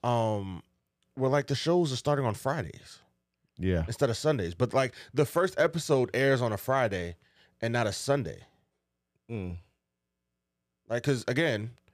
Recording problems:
none

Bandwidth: 15 kHz